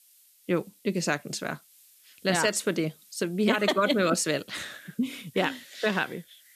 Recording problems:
hiss; faint; throughout; 25 dB below the speech

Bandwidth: 14.5 kHz